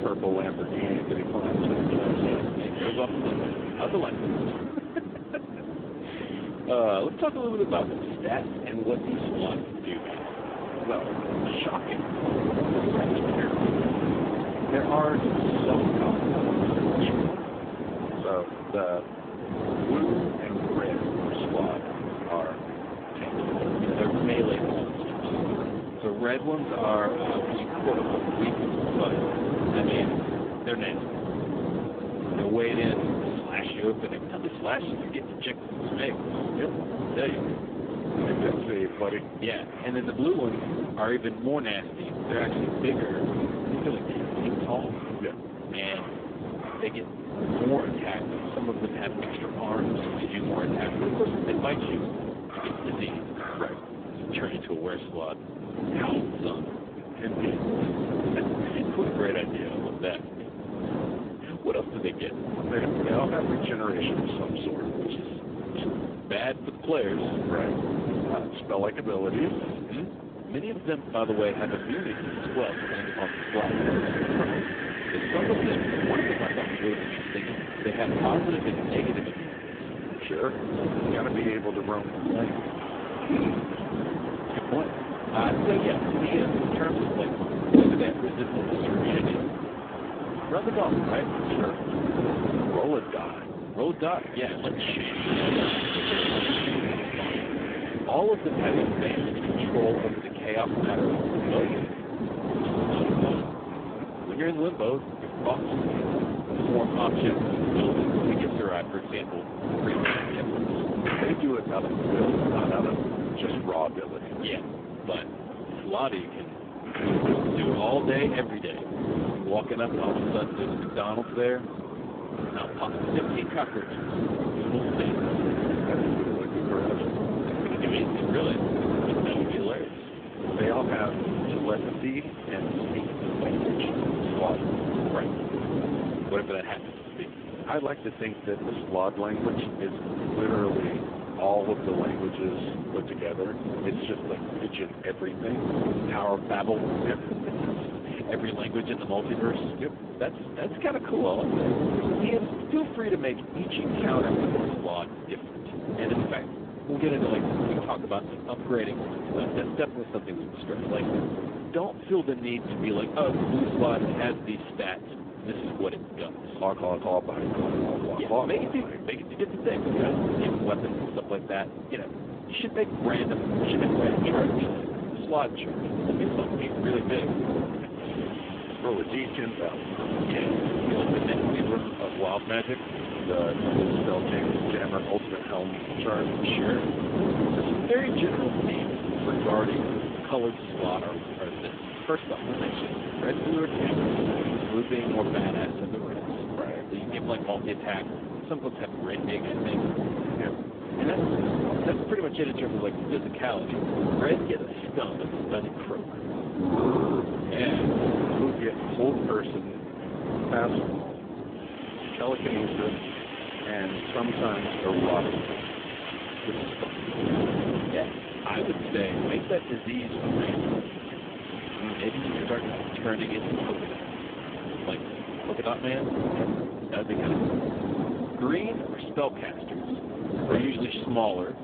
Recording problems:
phone-call audio; poor line
wind noise on the microphone; heavy; 2 dB below the speech
wind in the background; loud; throughout; 6 dB below the speech

